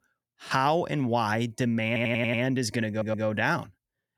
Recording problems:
audio stuttering; at 2 s and at 3 s

